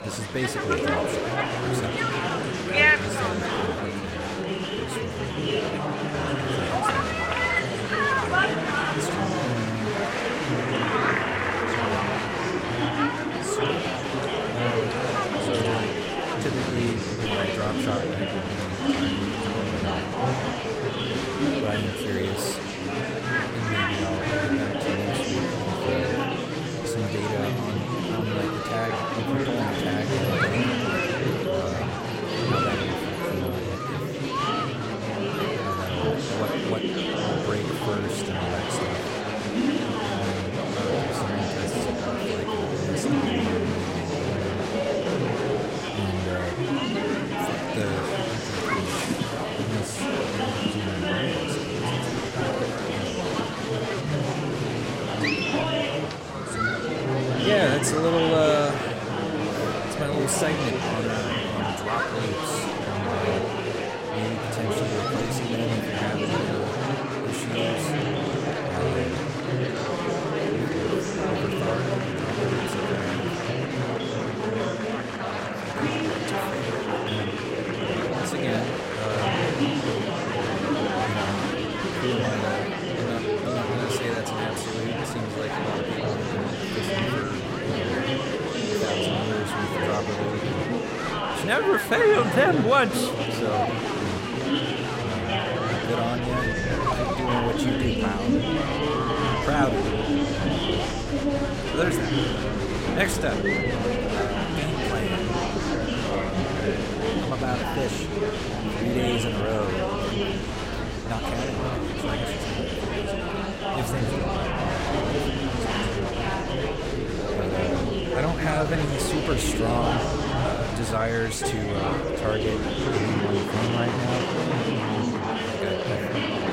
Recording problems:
murmuring crowd; very loud; throughout; 4 dB above the speech

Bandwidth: 16 kHz